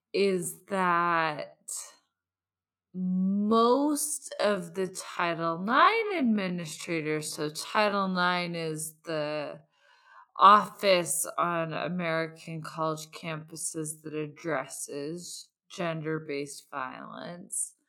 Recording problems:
wrong speed, natural pitch; too slow; 0.5 times normal speed

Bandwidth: 18 kHz